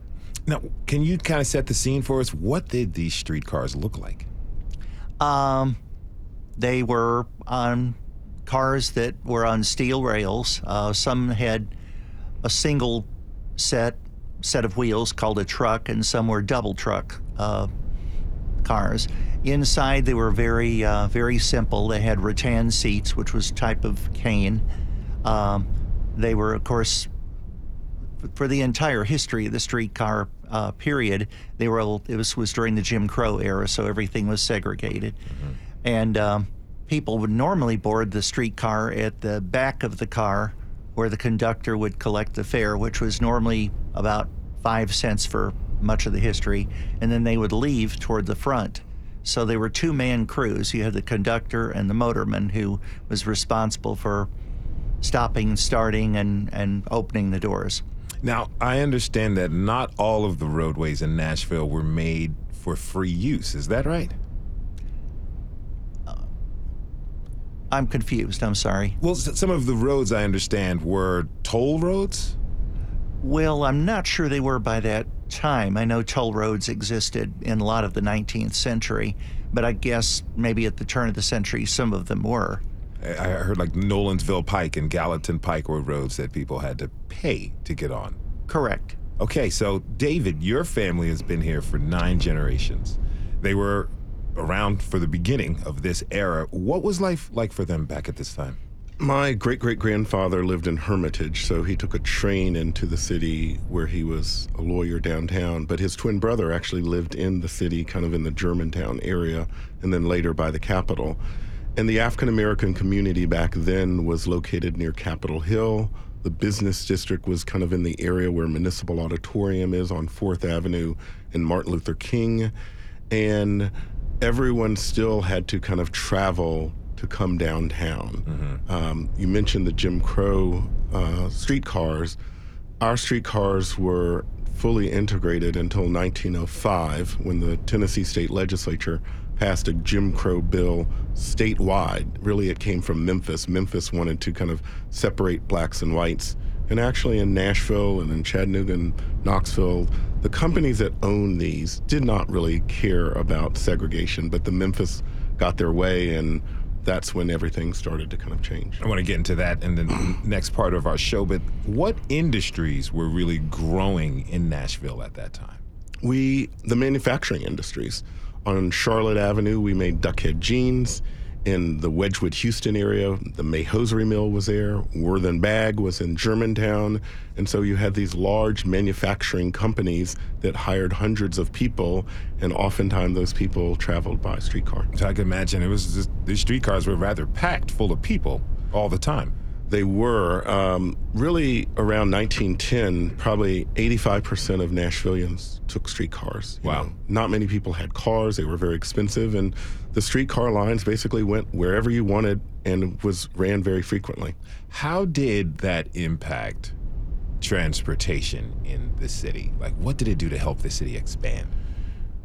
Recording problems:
low rumble; faint; throughout; 25 dB below the speech

